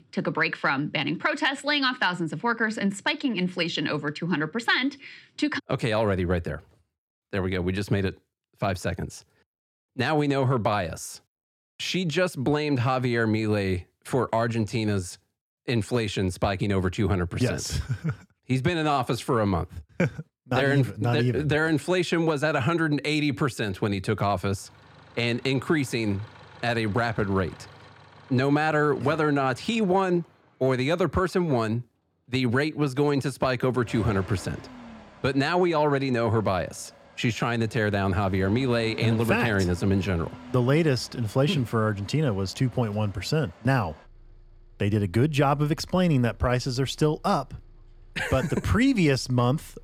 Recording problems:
traffic noise; faint; from 25 s on; 20 dB below the speech

